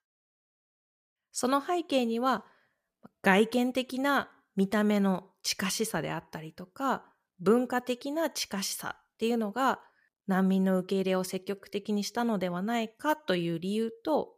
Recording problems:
none

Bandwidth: 15 kHz